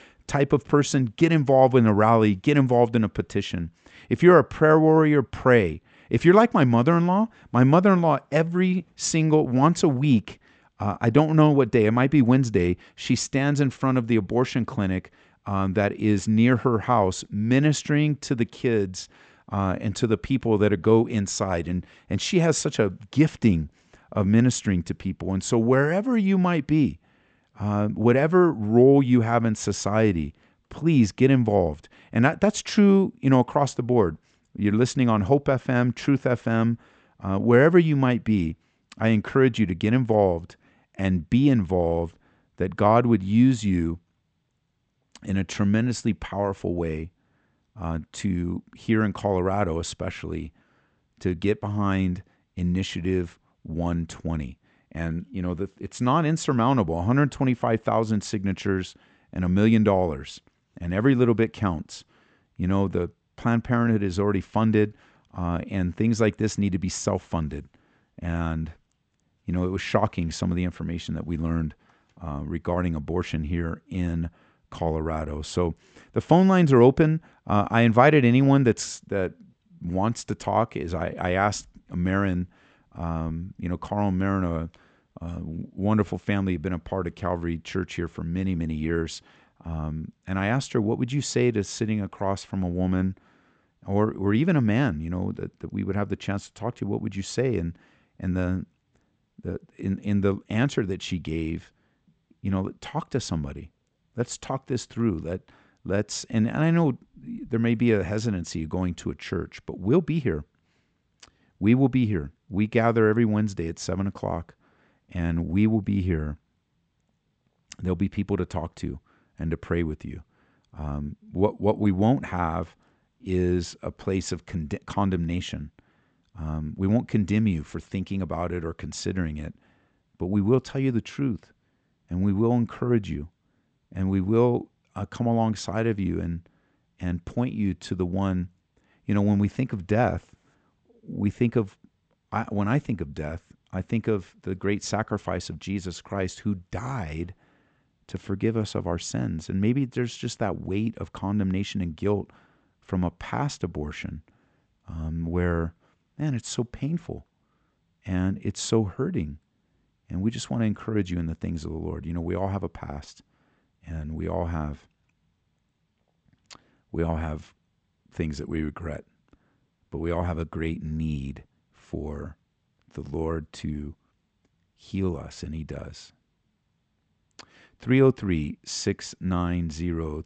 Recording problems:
high frequencies cut off; noticeable; nothing above 8 kHz

